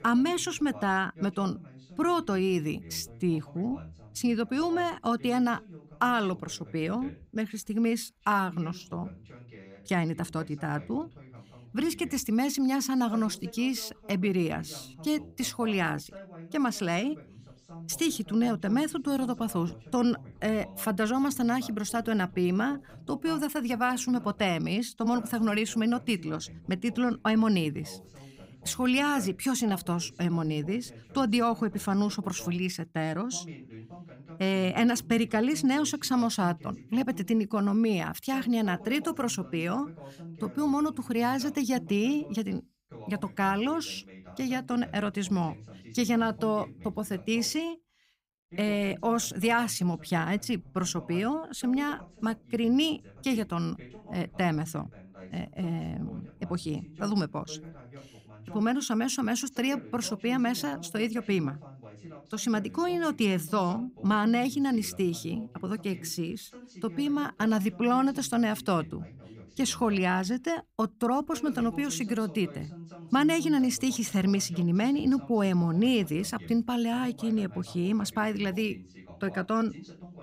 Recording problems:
voice in the background; noticeable; throughout; 20 dB below the speech

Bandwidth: 15.5 kHz